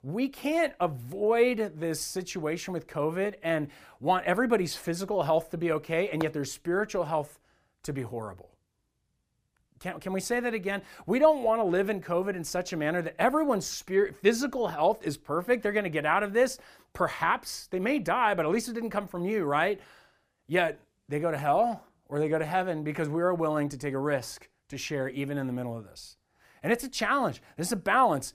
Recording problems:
none

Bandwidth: 15 kHz